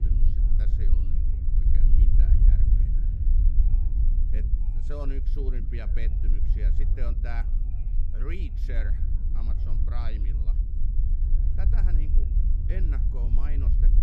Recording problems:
low rumble; loud; throughout; 2 dB below the speech
background chatter; faint; throughout; 3 voices, 20 dB below the speech

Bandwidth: 14 kHz